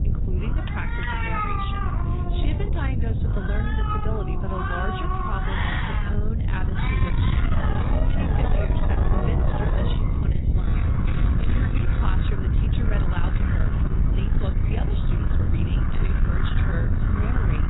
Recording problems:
garbled, watery; badly; nothing above 4 kHz
echo of what is said; faint; from 10 s on; 540 ms later, 20 dB below the speech
distortion; slight; 10 dB below the speech
animal sounds; very loud; throughout; 1 dB above the speech
wind noise on the microphone; heavy; 1 dB below the speech
alarm; noticeable; at 0.5 s; peak 10 dB below the speech
alarm; loud; from 7.5 to 10 s and from 11 to 12 s; peak 3 dB above the speech

